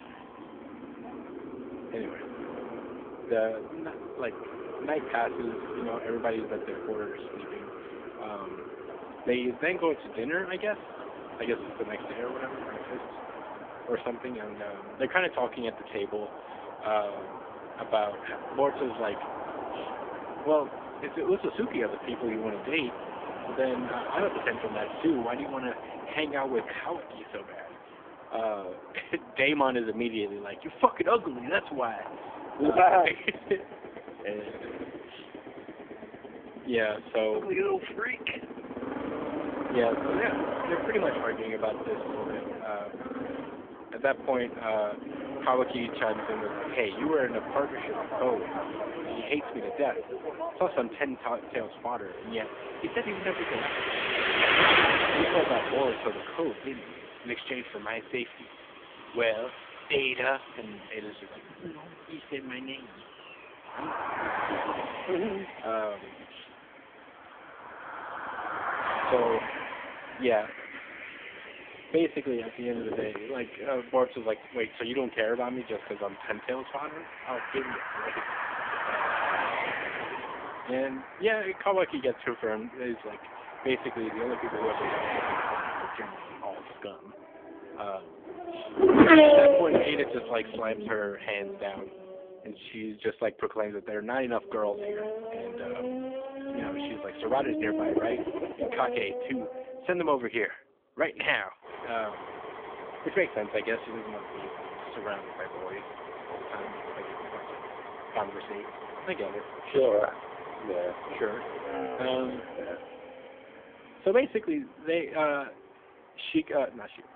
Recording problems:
phone-call audio; poor line; nothing above 3.5 kHz
traffic noise; loud; throughout; 1 dB below the speech

